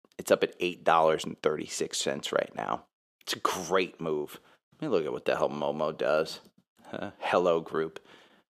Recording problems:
thin; very; fading below 450 Hz

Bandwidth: 14.5 kHz